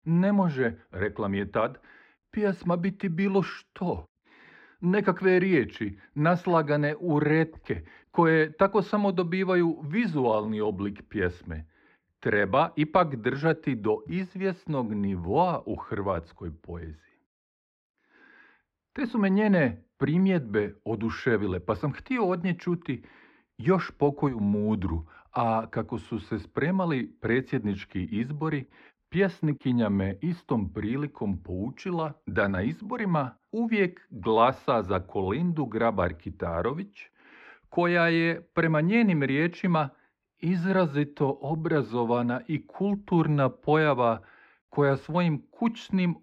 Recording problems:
muffled; slightly; fading above 2 kHz

